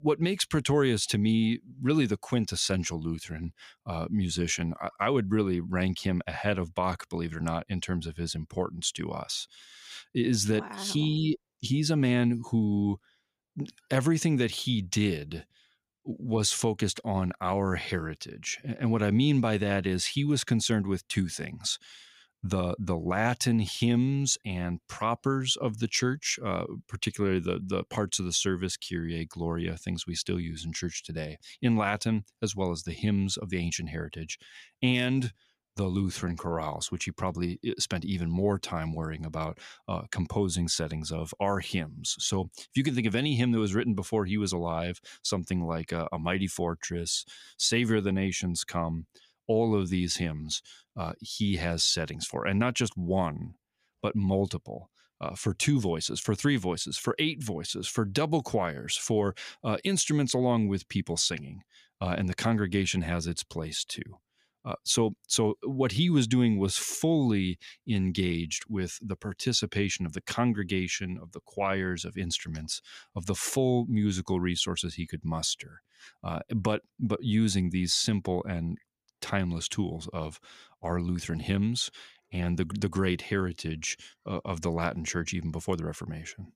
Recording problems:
none

